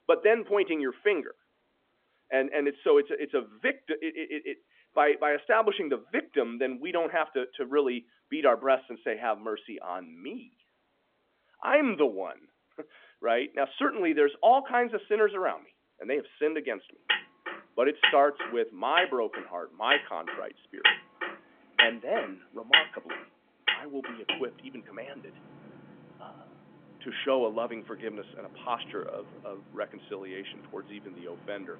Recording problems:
phone-call audio; nothing above 3.5 kHz
traffic noise; very loud; from 17 s on; 1 dB above the speech

